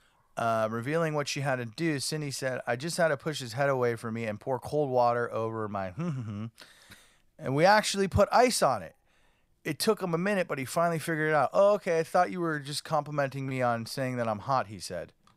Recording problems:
none

